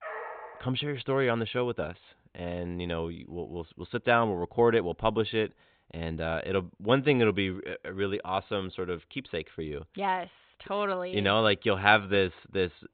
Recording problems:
high frequencies cut off; severe; nothing above 4 kHz
dog barking; noticeable; at the start; peak 10 dB below the speech

